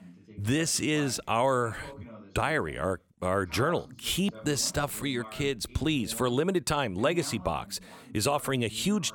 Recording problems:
voice in the background; noticeable; throughout; 20 dB below the speech

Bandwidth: 18 kHz